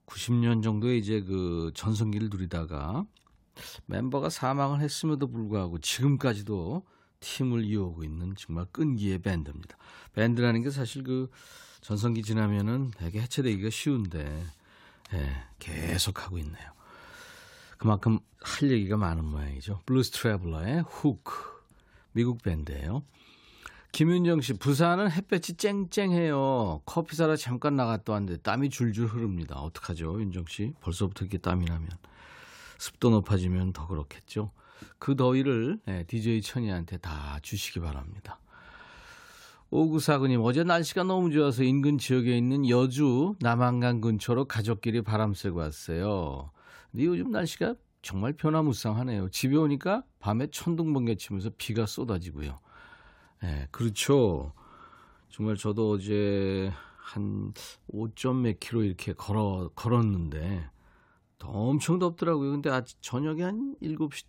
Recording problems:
none

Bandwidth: 16 kHz